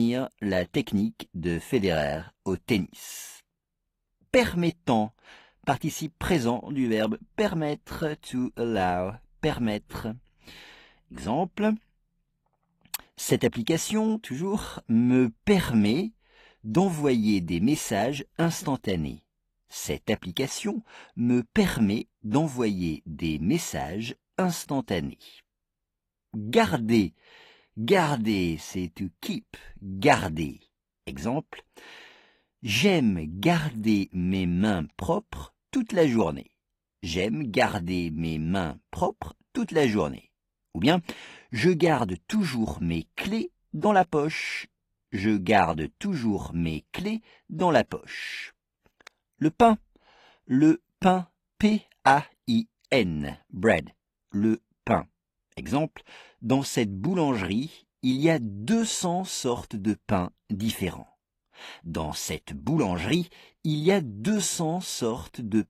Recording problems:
garbled, watery; slightly; nothing above 14.5 kHz
abrupt cut into speech; at the start

